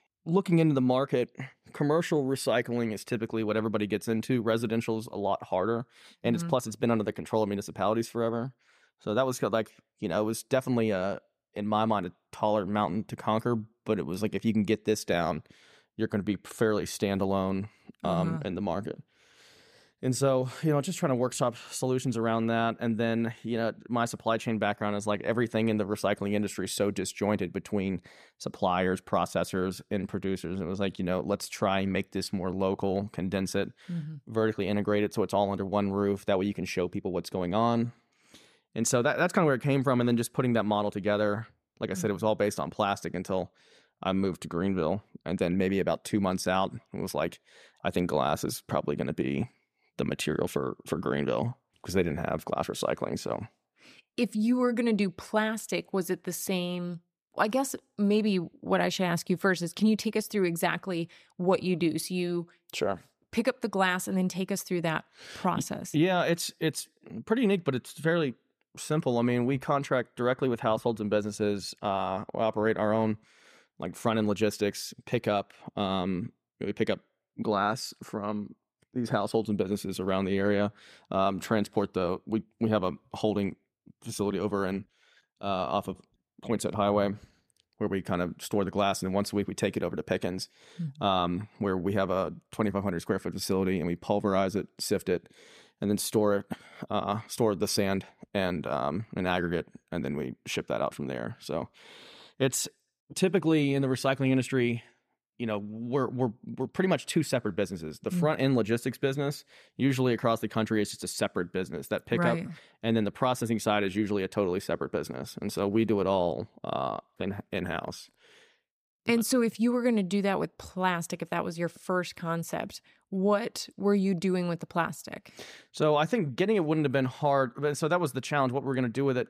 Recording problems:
none

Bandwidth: 14.5 kHz